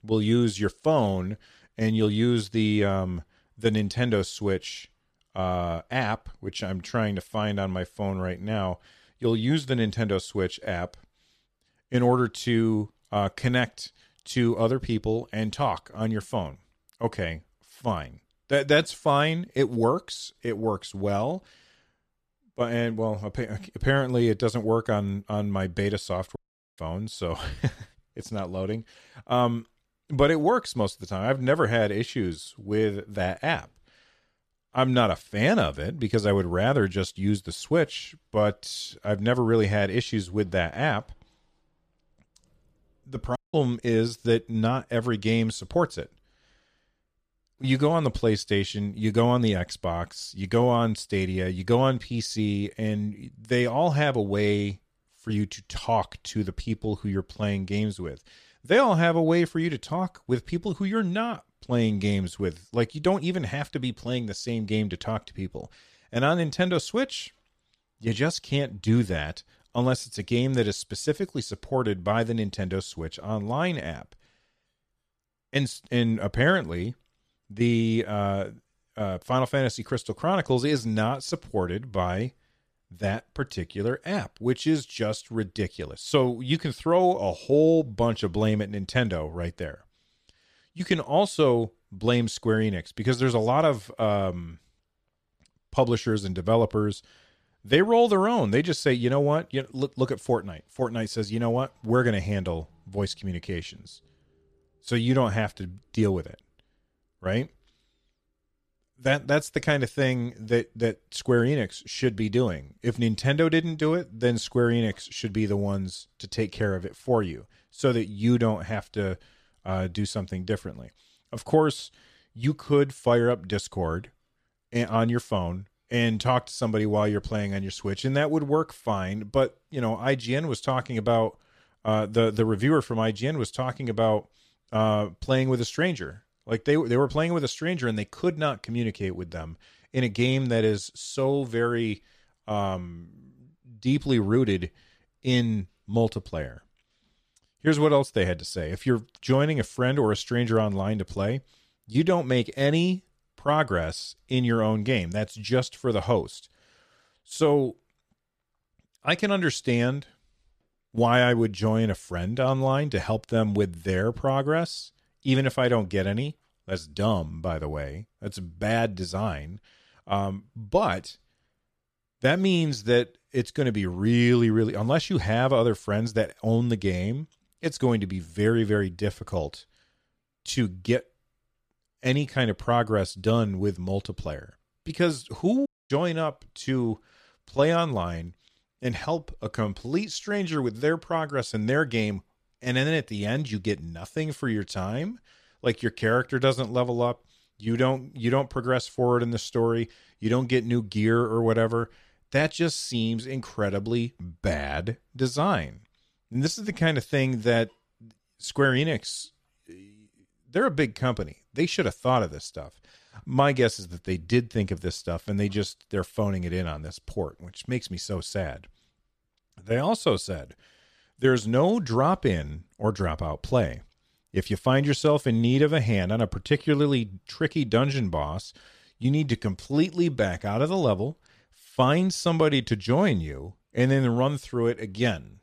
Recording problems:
audio cutting out; at 26 s, at 43 s and at 3:06

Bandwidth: 14.5 kHz